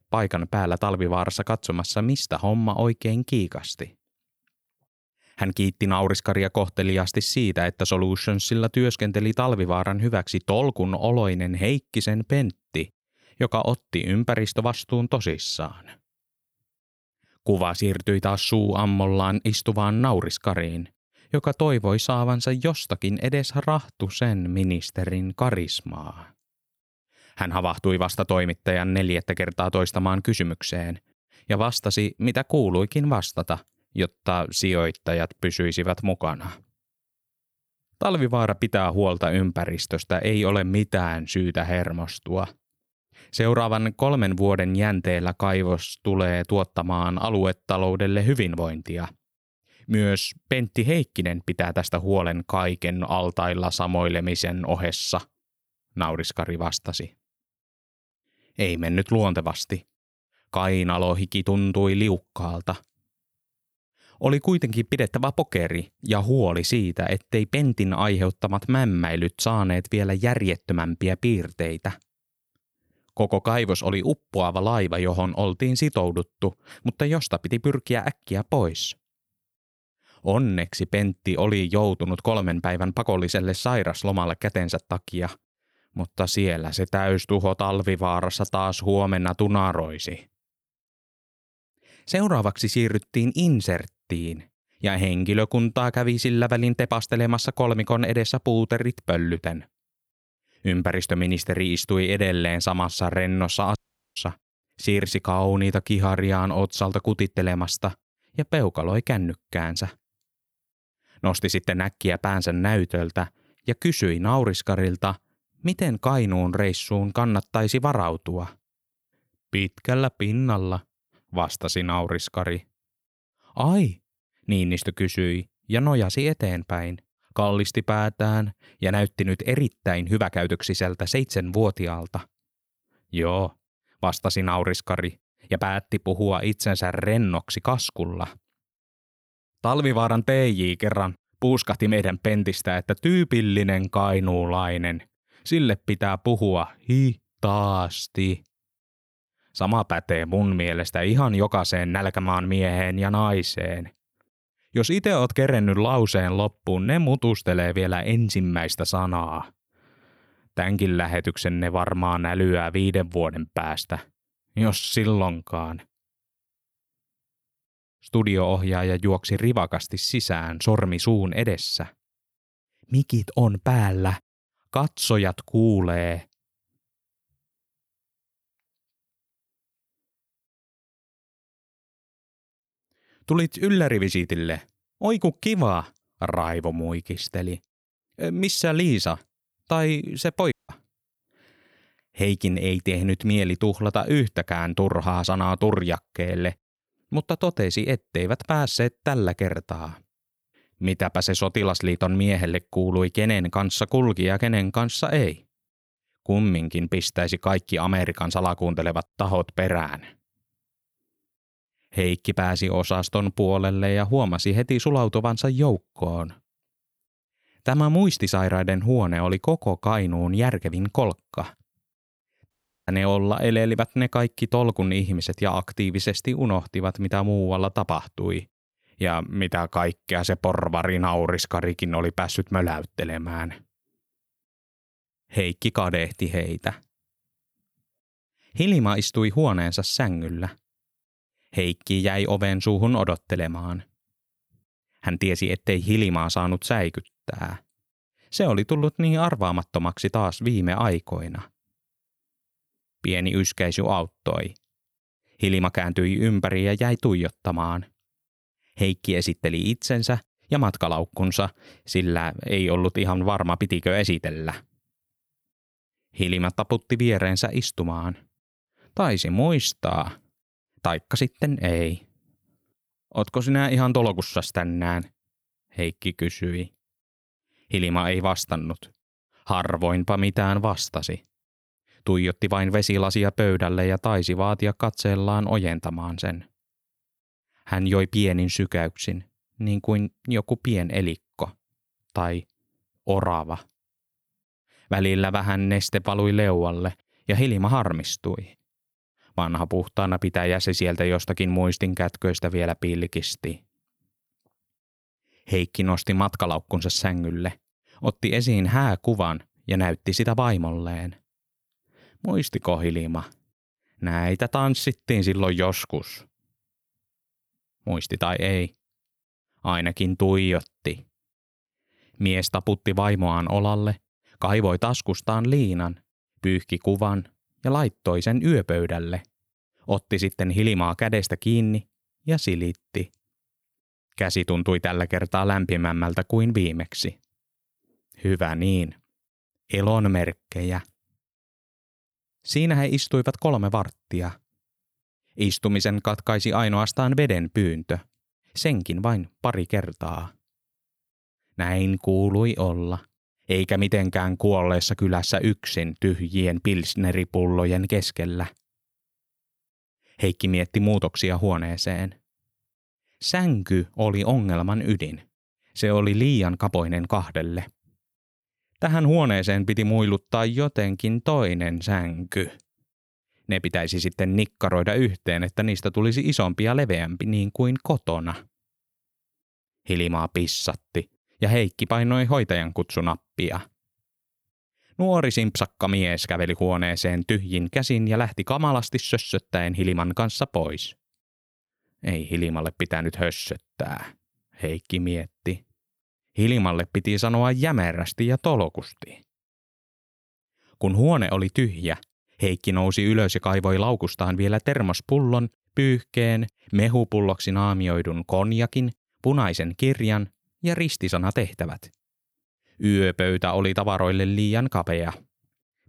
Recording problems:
audio cutting out; at 1:44, at 3:11 and at 3:43

